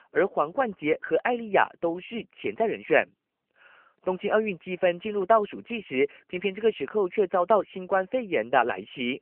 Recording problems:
phone-call audio; nothing above 3 kHz

